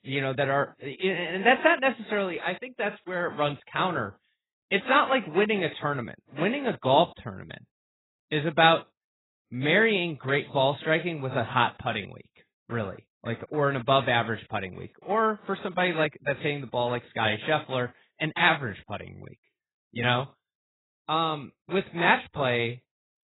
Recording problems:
garbled, watery; badly; nothing above 4 kHz

